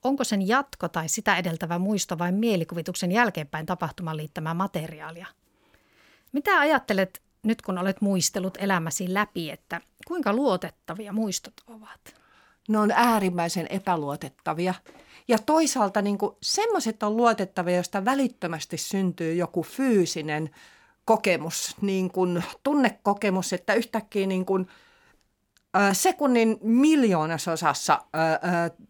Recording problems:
none

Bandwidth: 17 kHz